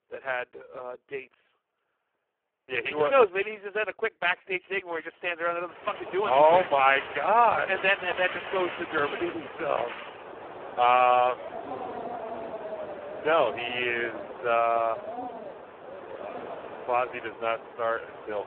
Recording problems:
phone-call audio; poor line
wind in the background; noticeable; from 6 s on; 10 dB below the speech

